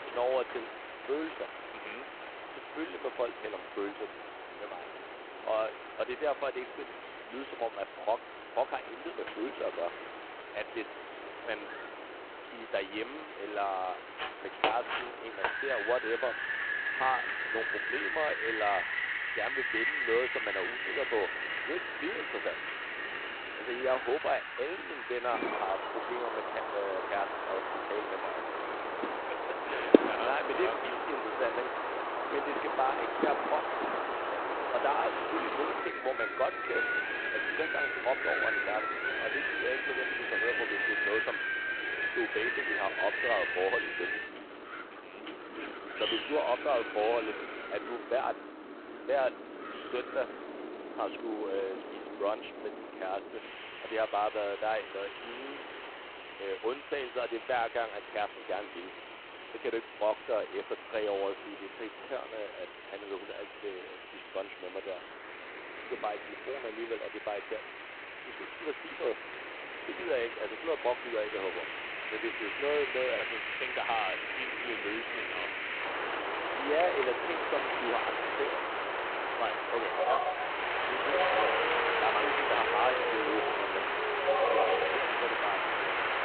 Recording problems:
phone-call audio; poor line; nothing above 4 kHz
wind in the background; very loud; throughout; 2 dB above the speech

